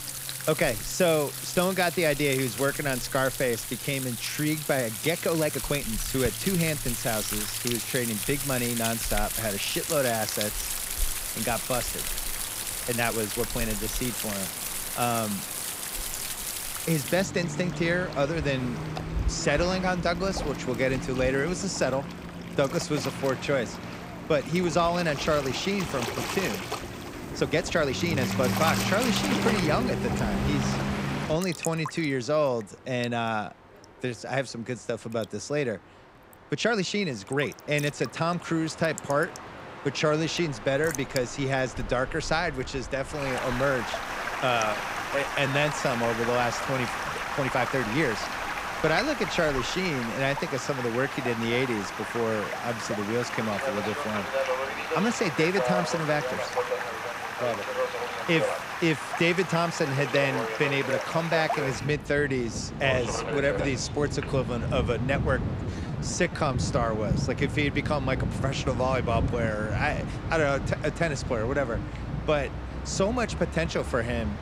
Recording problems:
rain or running water; loud; throughout; 4 dB below the speech
train or aircraft noise; noticeable; throughout; 10 dB below the speech
uneven, jittery; strongly; from 5 s to 1:07

